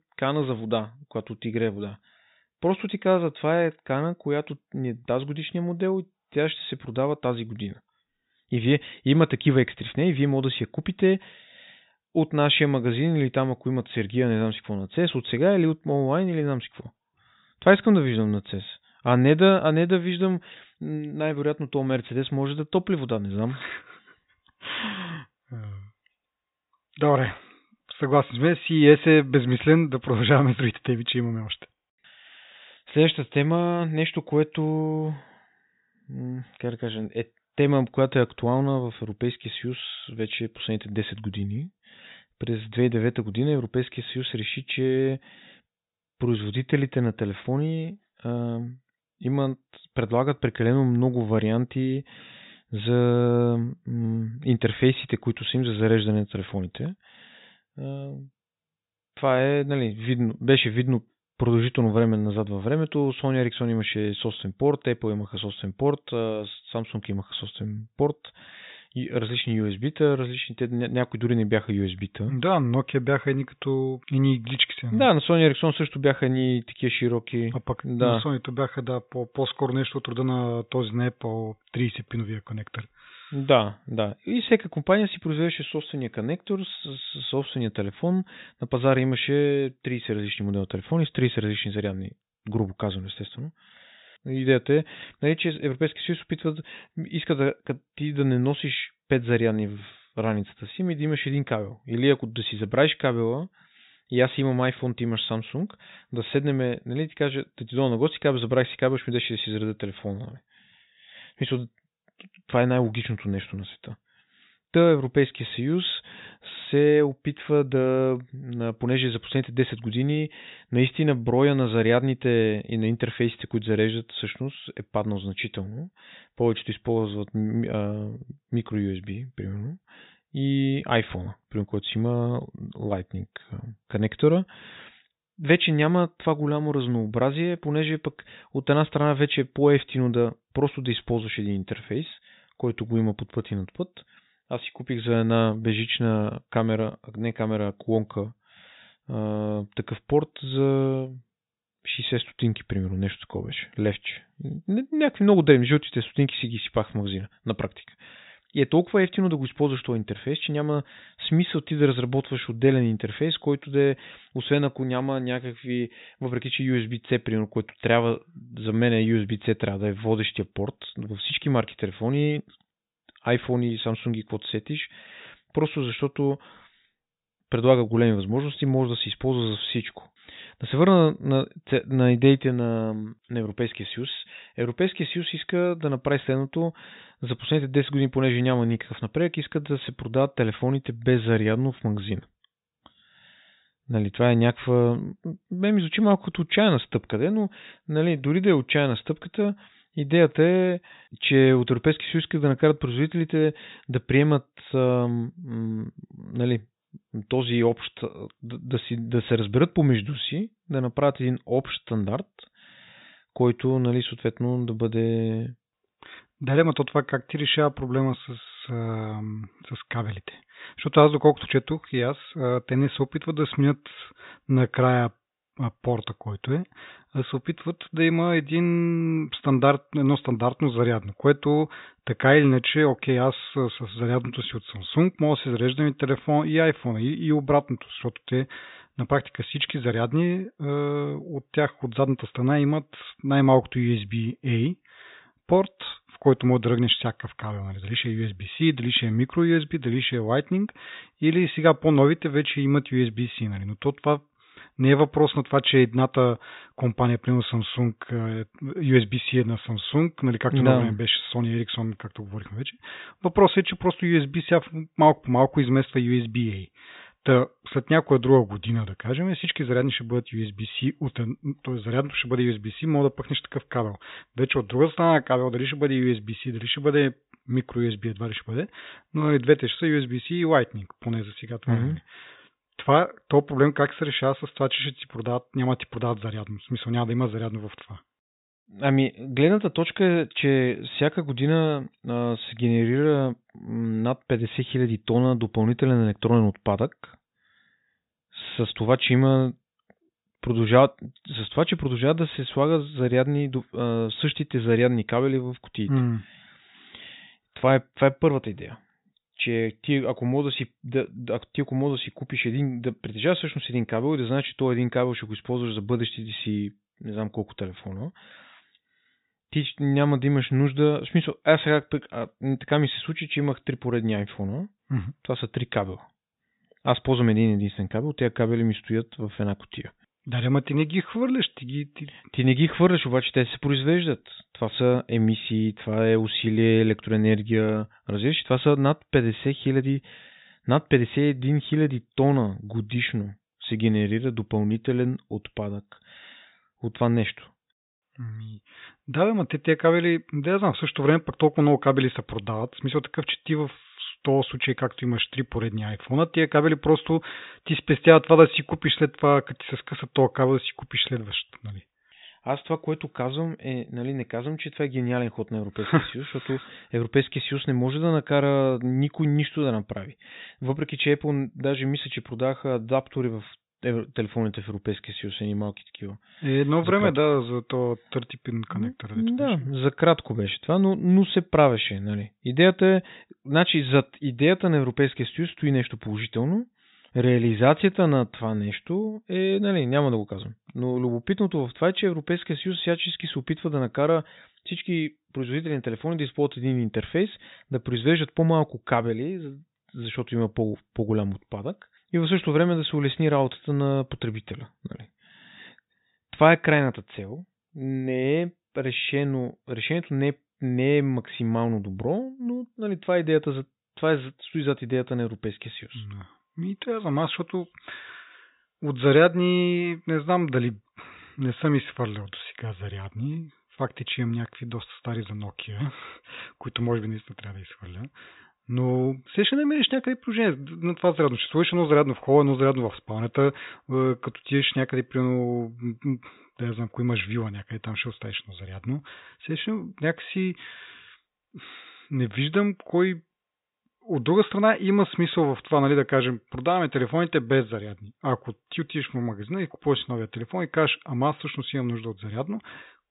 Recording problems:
high frequencies cut off; severe; nothing above 4 kHz

